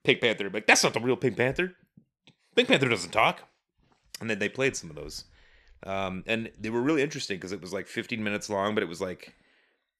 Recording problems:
none

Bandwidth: 13.5 kHz